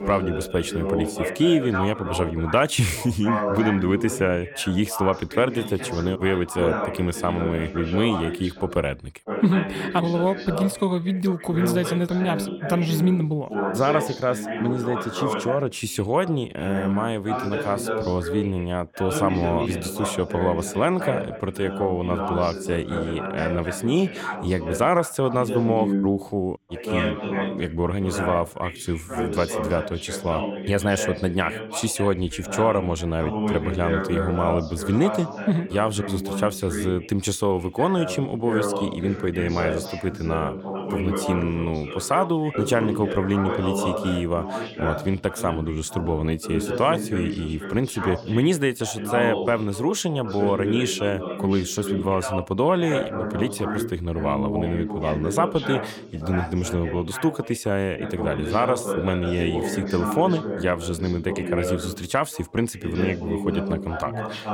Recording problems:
background chatter; loud; throughout; 2 voices, 5 dB below the speech

